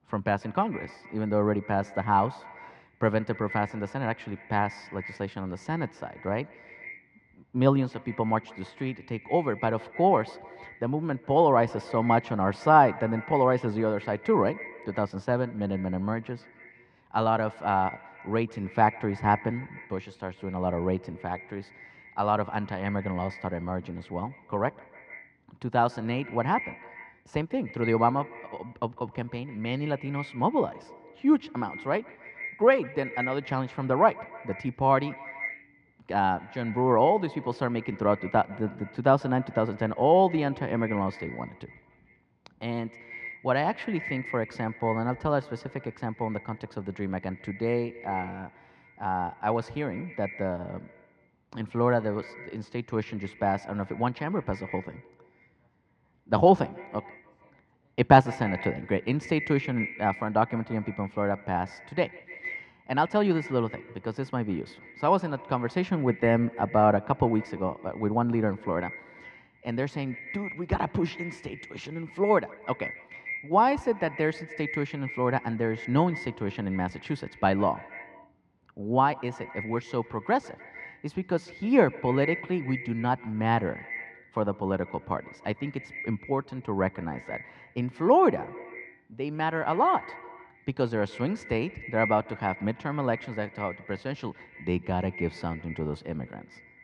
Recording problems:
muffled; very; fading above 2.5 kHz
echo of what is said; noticeable; throughout; 150 ms later, 15 dB below the speech

